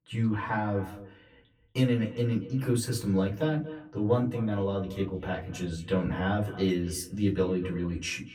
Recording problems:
off-mic speech; far
echo of what is said; noticeable; throughout; 230 ms later, 15 dB below the speech
room echo; very slight; dies away in 0.2 s

